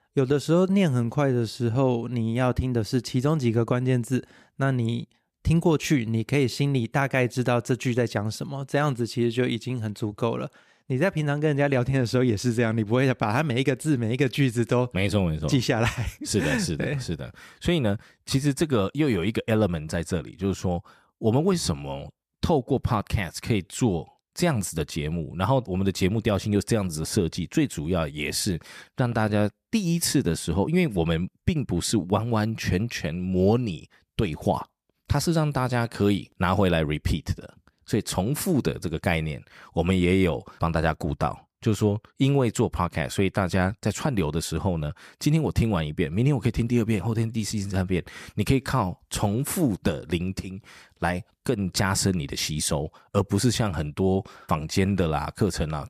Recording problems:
none

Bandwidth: 14.5 kHz